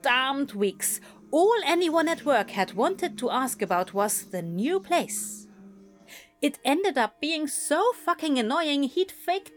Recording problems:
background music; faint; throughout; 25 dB below the speech

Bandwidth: 18 kHz